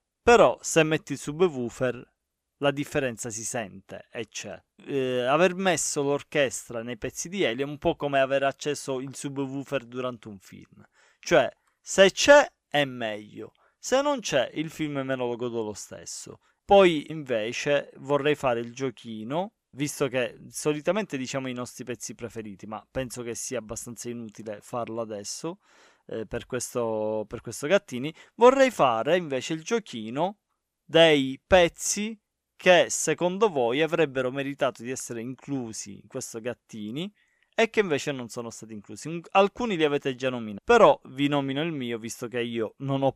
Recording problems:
none

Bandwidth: 15 kHz